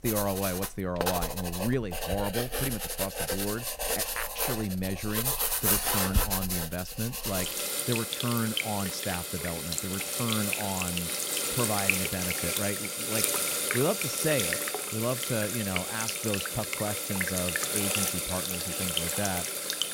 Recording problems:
household noises; very loud; throughout; 4 dB above the speech

